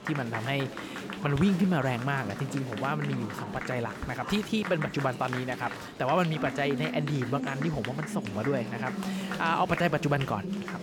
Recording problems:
murmuring crowd; loud; throughout; 6 dB below the speech

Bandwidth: 18.5 kHz